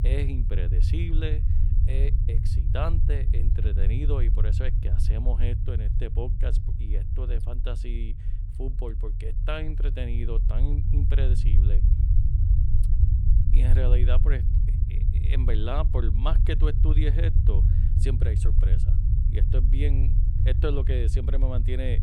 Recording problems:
low rumble; loud; throughout; 5 dB below the speech

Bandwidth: 17 kHz